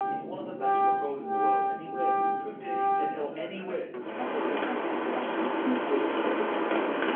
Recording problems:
off-mic speech; far
room echo; slight; dies away in 0.4 s
phone-call audio
background music; very loud; throughout; 8 dB above the speech
rain or running water; very loud; throughout; 8 dB above the speech

